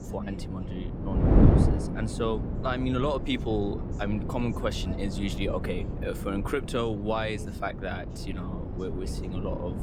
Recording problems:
wind noise on the microphone; heavy; 5 dB below the speech
voice in the background; noticeable; throughout; 15 dB below the speech

